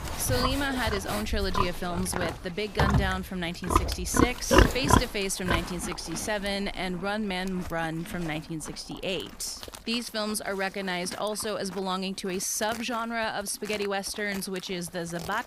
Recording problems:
animal sounds; very loud; throughout; 2 dB above the speech

